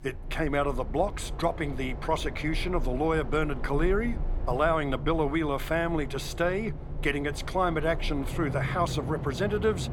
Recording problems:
train or aircraft noise; loud; throughout; 7 dB below the speech

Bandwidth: 17 kHz